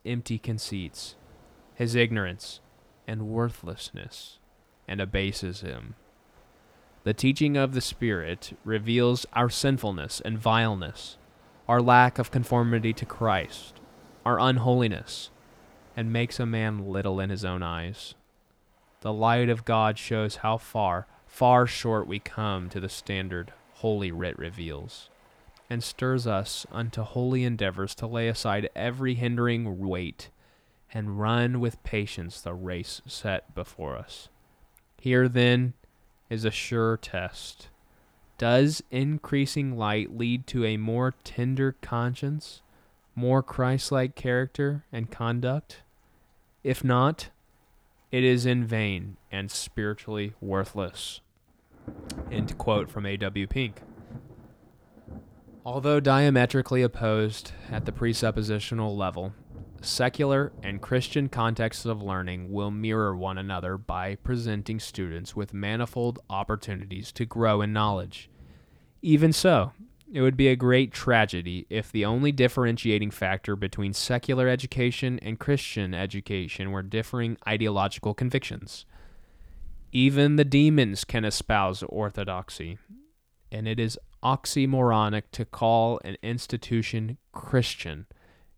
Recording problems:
rain or running water; faint; throughout; 25 dB below the speech

